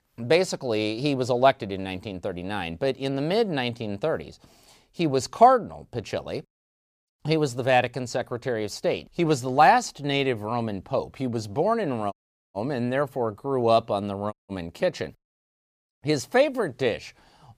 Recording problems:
audio cutting out; at 12 s and at 14 s

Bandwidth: 15 kHz